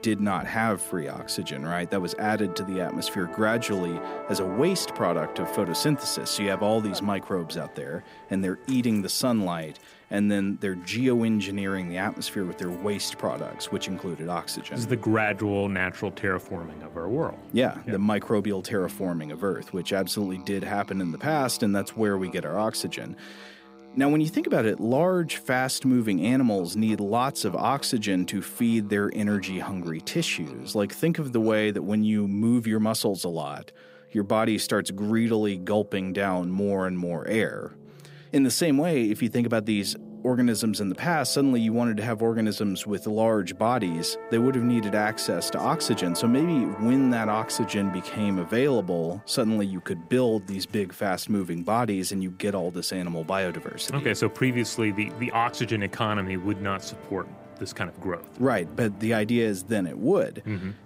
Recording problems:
background music; noticeable; throughout; 15 dB below the speech

